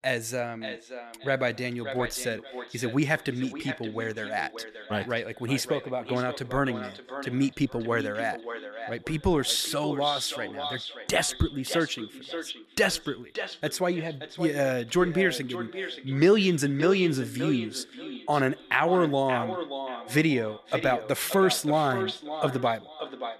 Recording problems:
echo of what is said; strong; throughout; 580 ms later, 10 dB below the speech

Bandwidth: 13.5 kHz